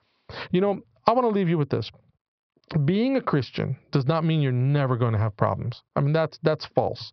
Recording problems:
squashed, flat; heavily
high frequencies cut off; noticeable; nothing above 5.5 kHz
muffled; very slightly; fading above 2 kHz

